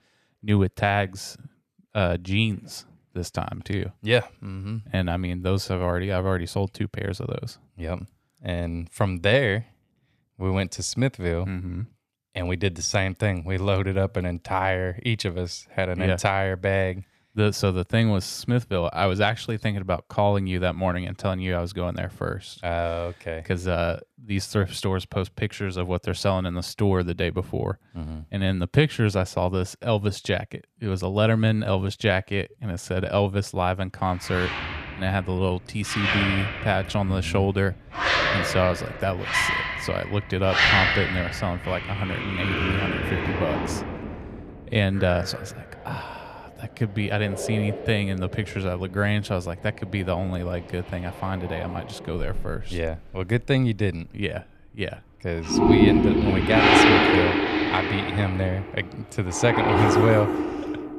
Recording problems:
household noises; very loud; from 35 s on; 3 dB above the speech

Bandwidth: 14.5 kHz